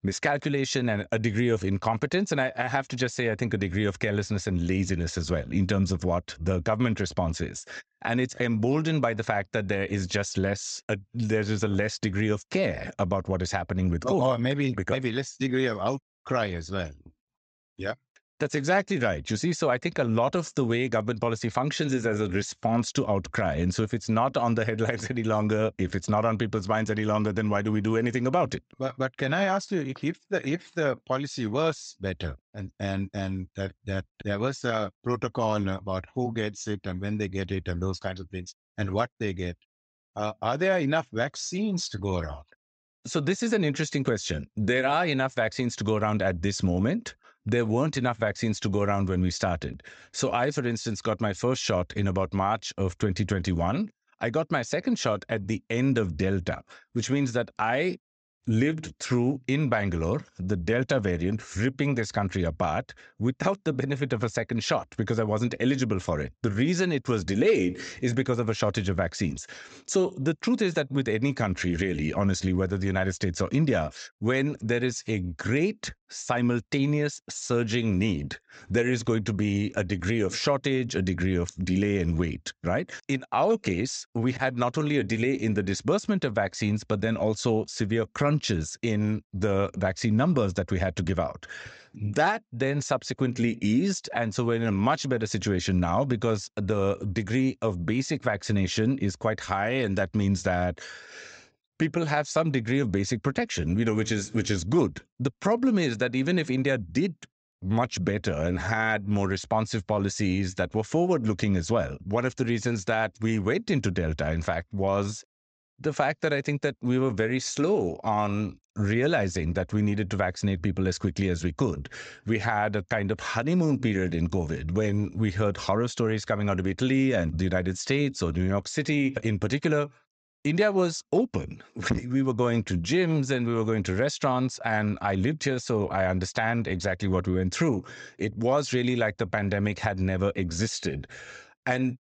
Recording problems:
high frequencies cut off; noticeable; nothing above 8 kHz

